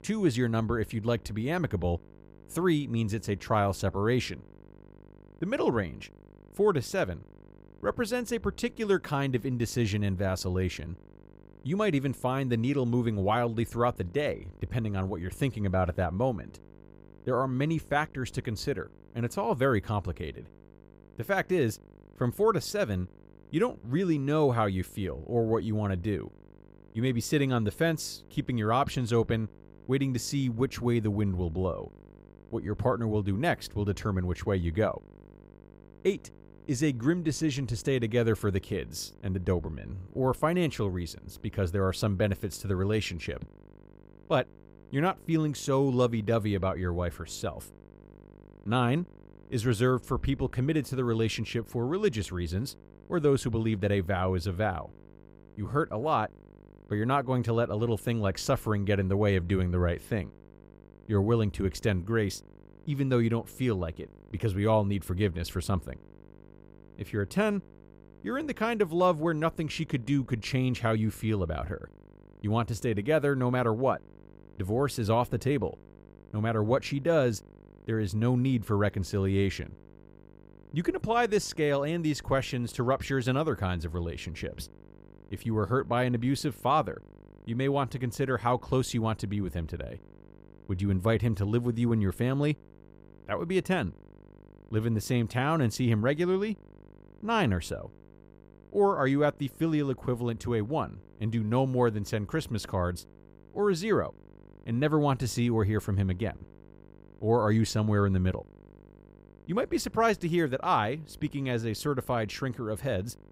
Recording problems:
electrical hum; faint; throughout; 50 Hz, 30 dB below the speech

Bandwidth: 15.5 kHz